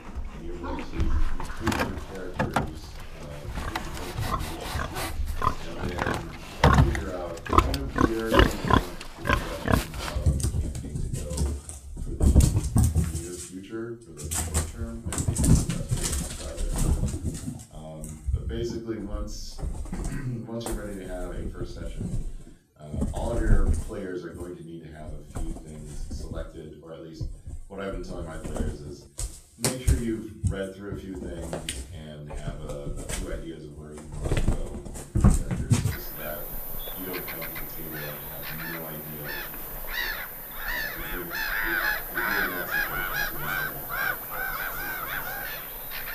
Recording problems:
off-mic speech; far
room echo; slight; dies away in 0.4 s
animal sounds; very loud; throughout; 10 dB above the speech

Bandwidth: 14.5 kHz